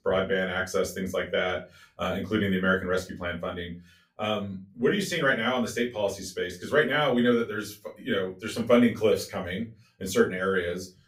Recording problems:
off-mic speech; far
room echo; very slight; dies away in 0.2 s

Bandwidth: 15.5 kHz